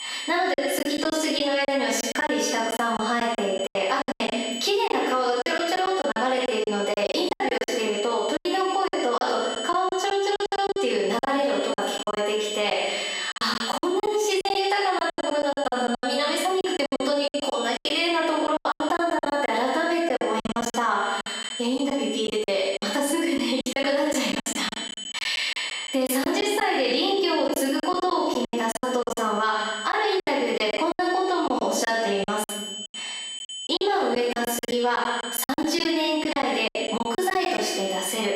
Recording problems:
off-mic speech; far
squashed, flat; heavily
room echo; noticeable; dies away in 0.9 s
thin; very slightly; fading below 400 Hz
high-pitched whine; noticeable; throughout; 3 kHz, 10 dB below the speech
choppy; very; 14% of the speech affected

